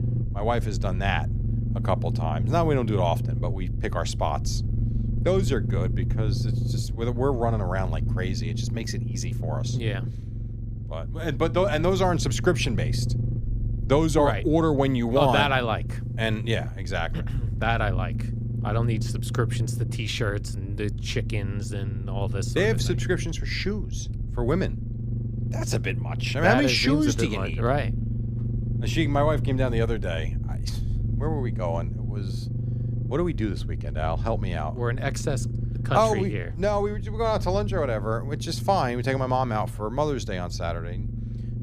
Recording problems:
low rumble; noticeable; throughout; 15 dB below the speech

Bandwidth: 15 kHz